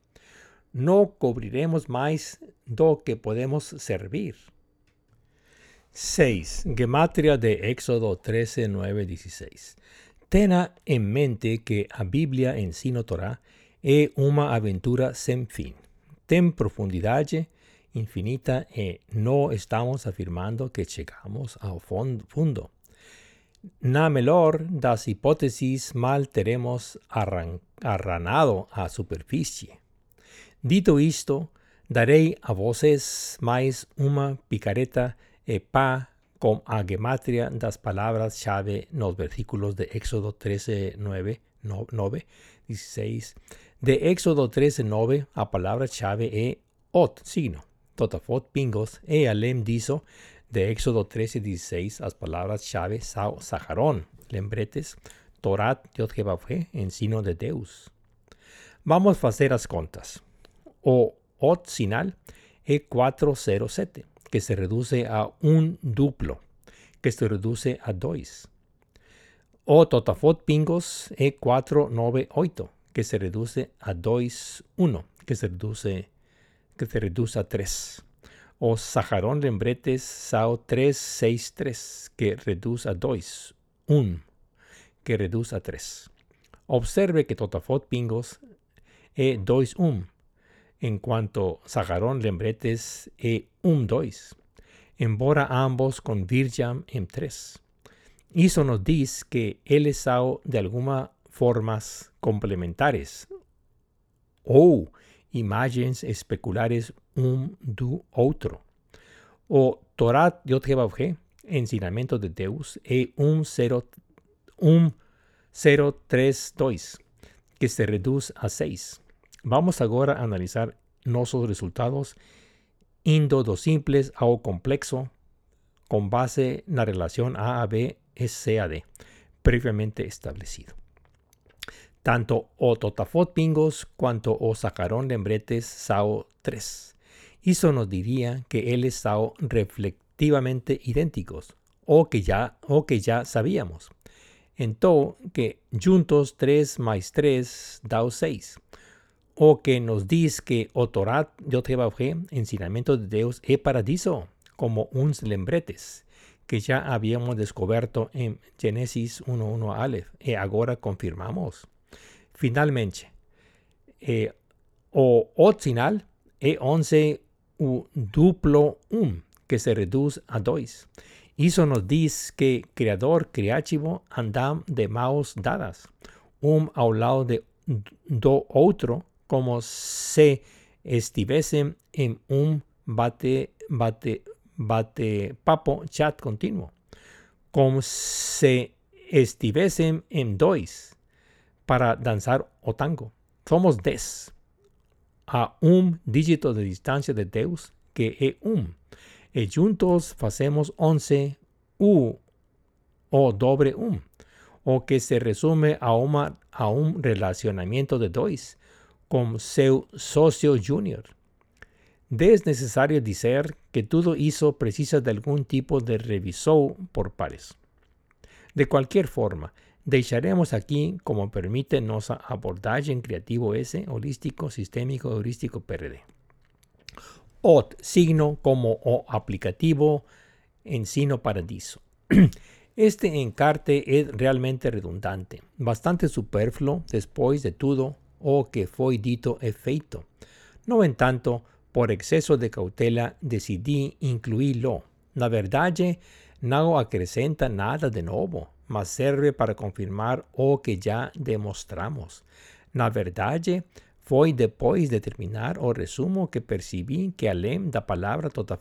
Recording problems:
none

